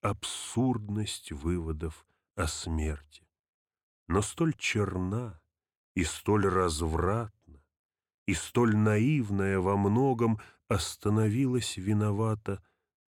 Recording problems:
none

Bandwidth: 18 kHz